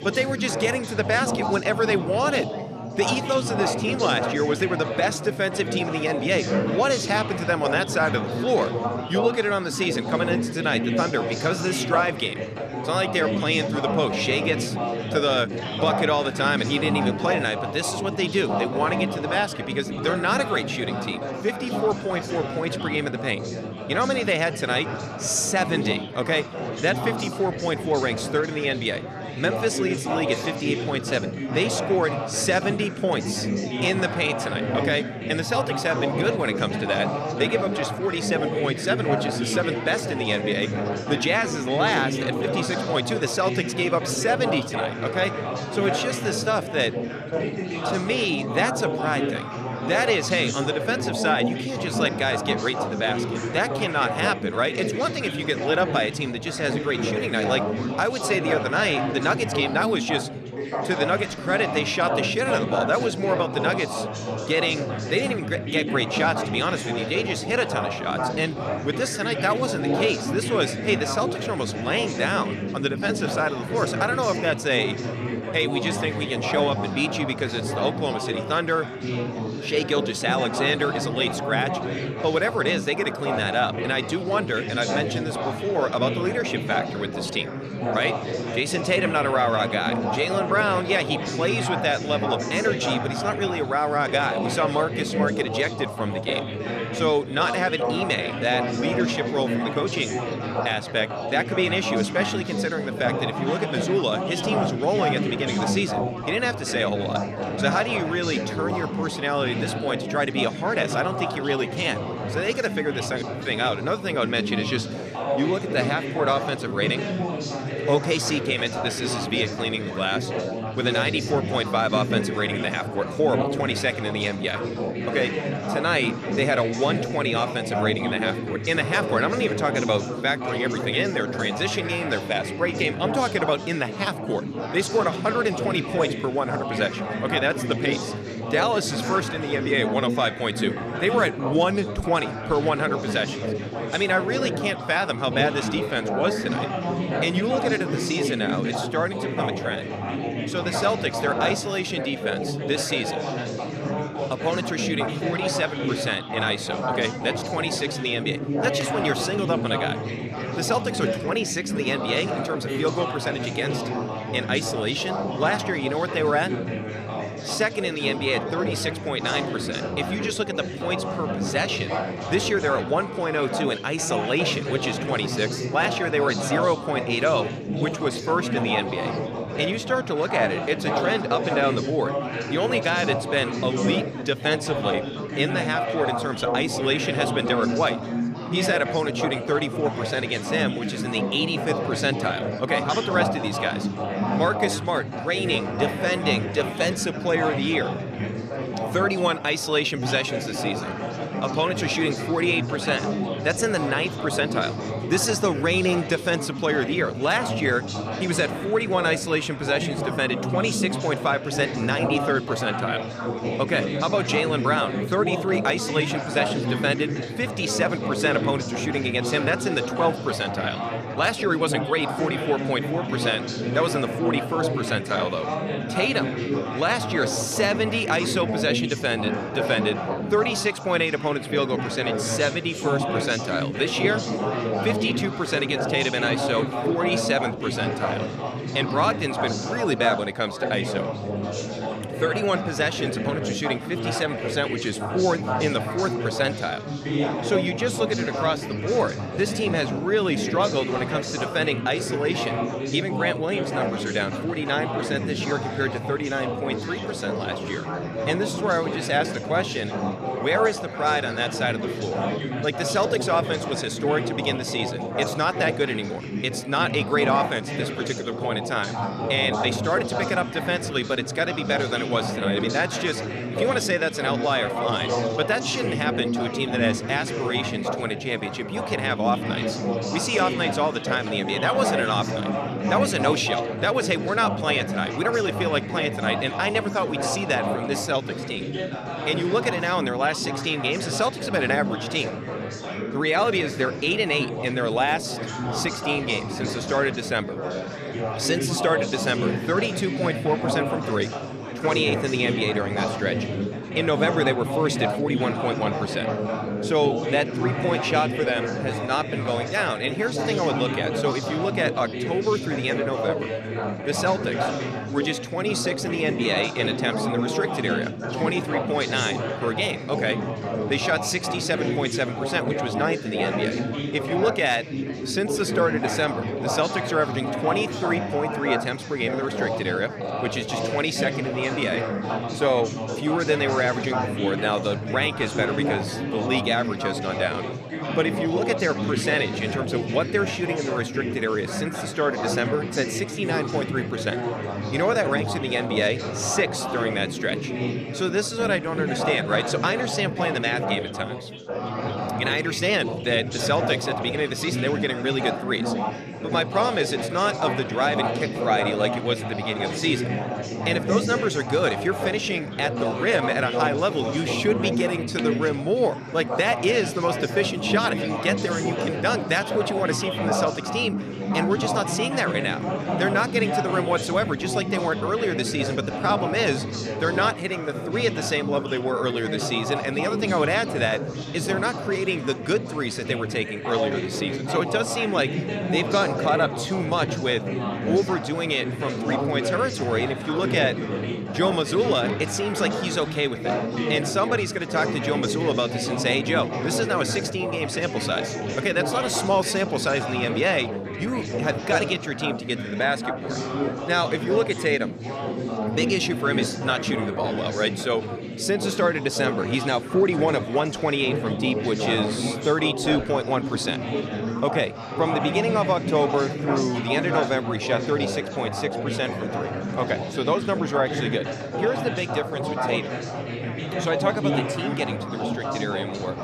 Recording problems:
chatter from many people; loud; throughout; 3 dB below the speech

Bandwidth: 14.5 kHz